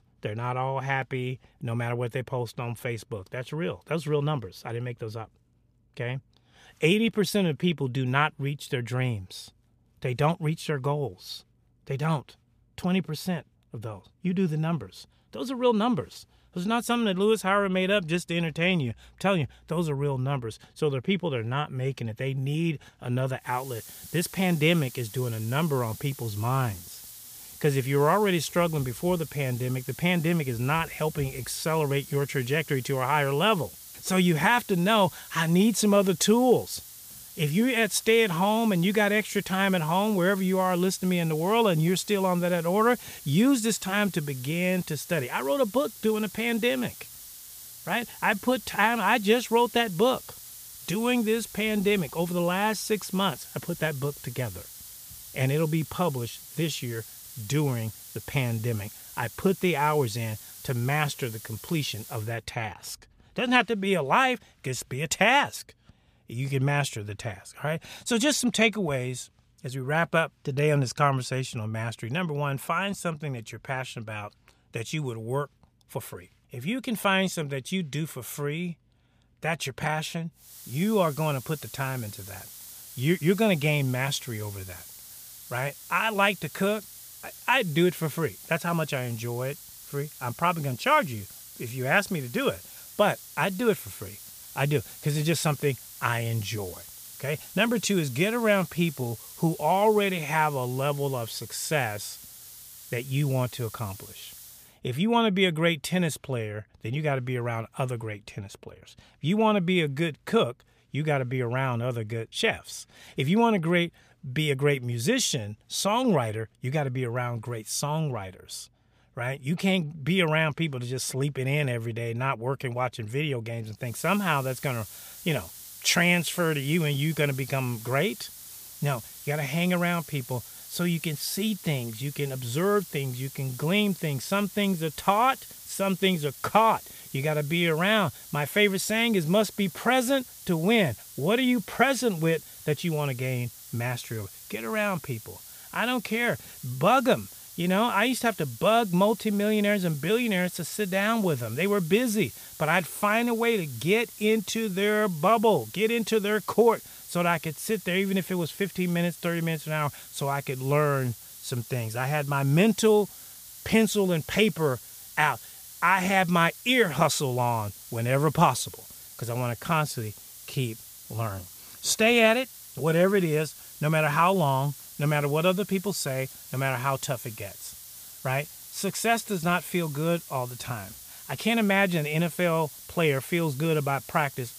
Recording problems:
hiss; noticeable; from 24 s to 1:02, from 1:20 to 1:45 and from 2:04 on; 15 dB below the speech

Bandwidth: 15 kHz